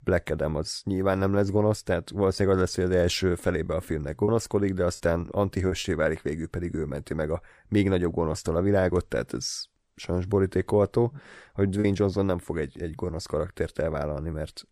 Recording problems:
choppy; occasionally; 1% of the speech affected

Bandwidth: 15 kHz